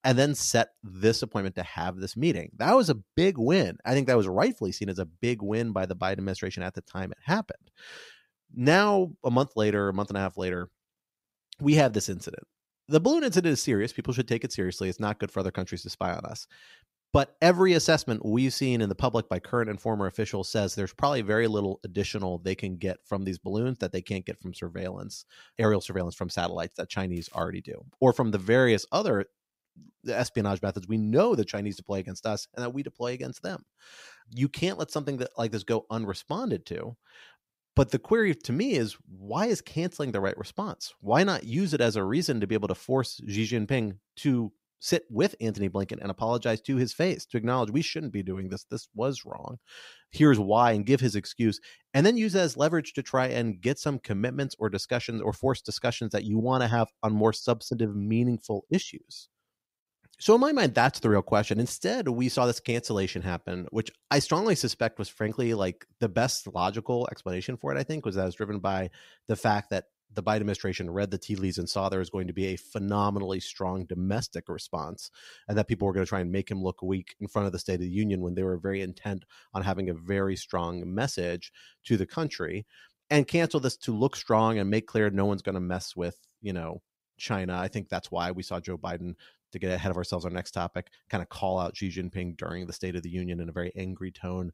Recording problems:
crackling; faint; at 27 s; 30 dB below the speech

